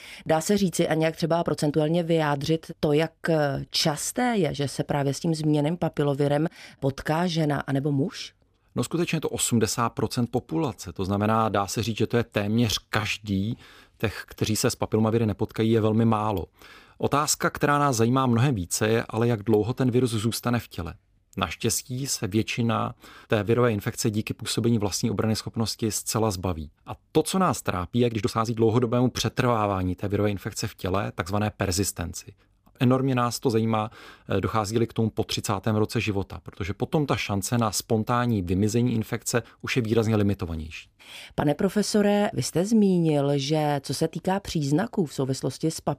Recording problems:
uneven, jittery; strongly; from 1 to 37 s

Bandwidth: 15 kHz